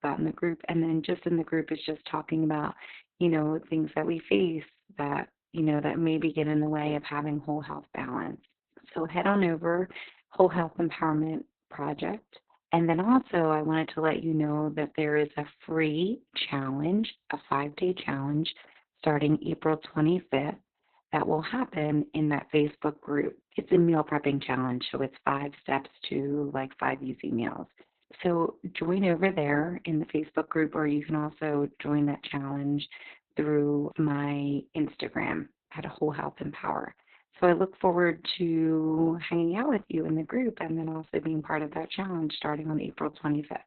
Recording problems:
garbled, watery; badly; nothing above 4 kHz

